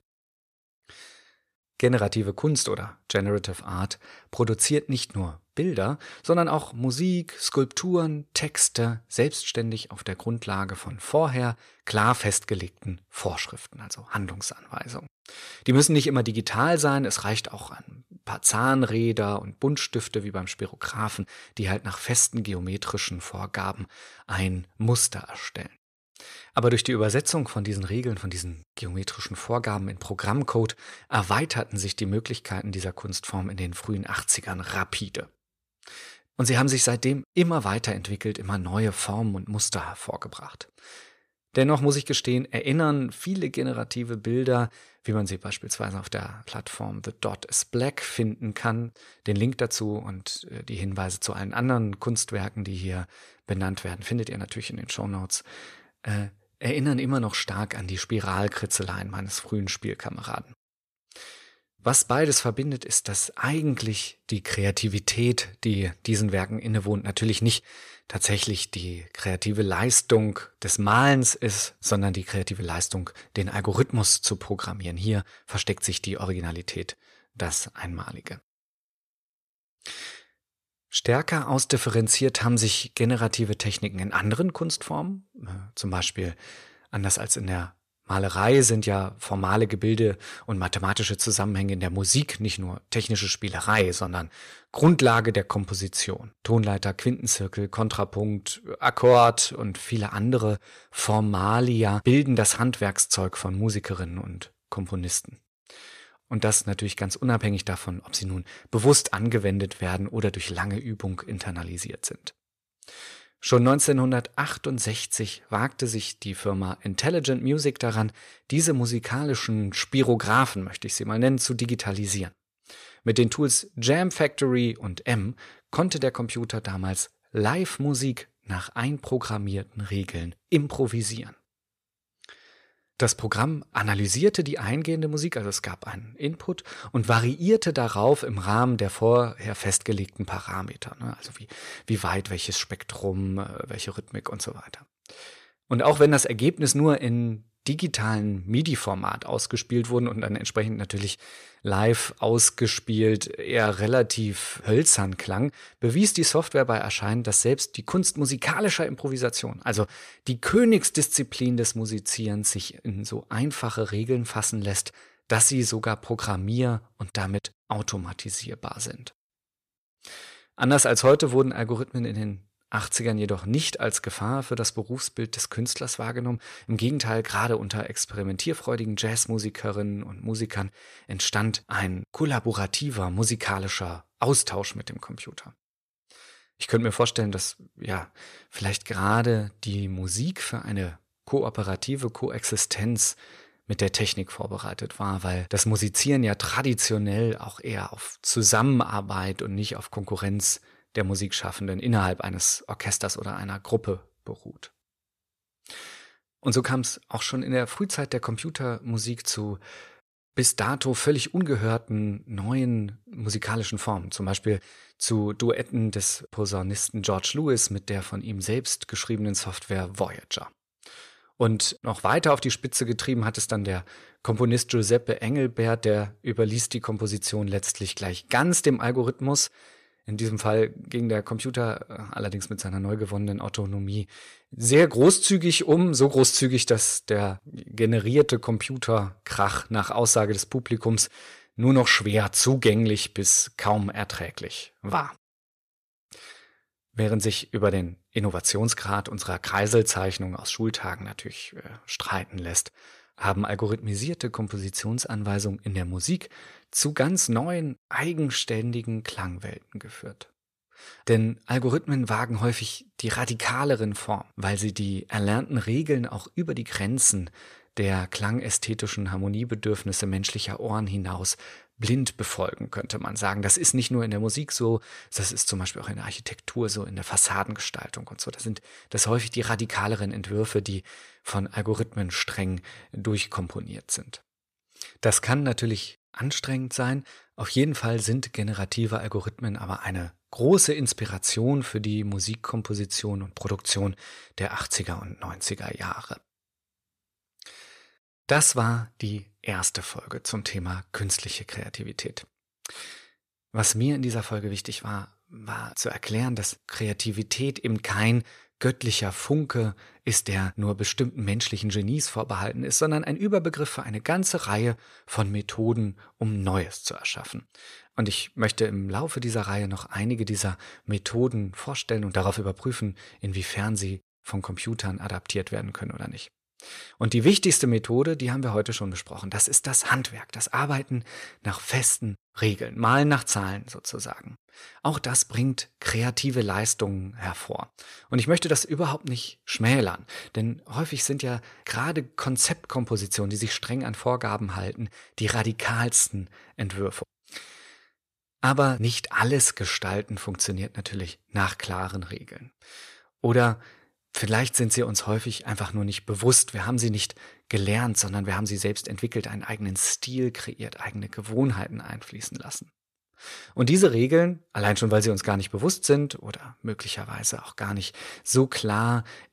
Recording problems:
none

